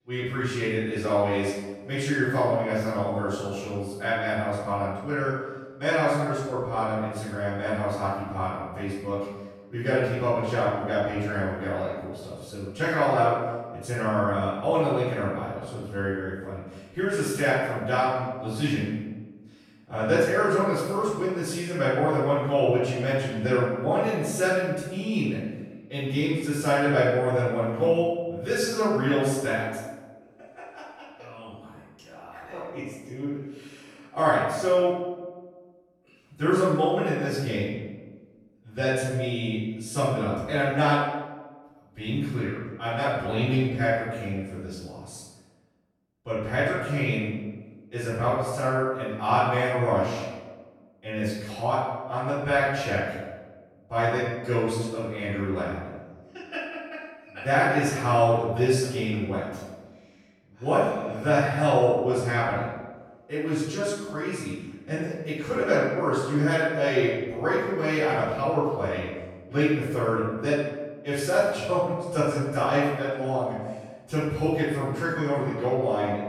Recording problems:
room echo; strong; dies away in 1.1 s
off-mic speech; far

